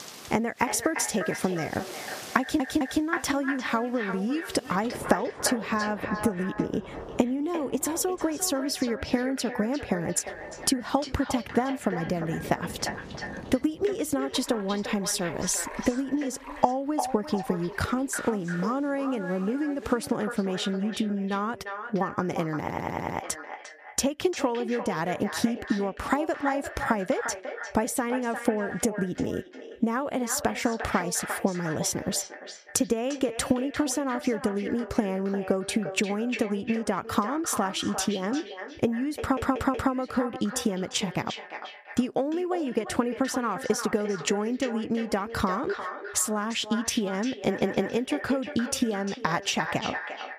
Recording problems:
echo of what is said; strong; throughout; 350 ms later, 9 dB below the speech
squashed, flat; somewhat, background pumping
rain or running water; noticeable; until 20 s; 15 dB below the speech
audio stuttering; 4 times, first at 2.5 s

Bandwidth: 14.5 kHz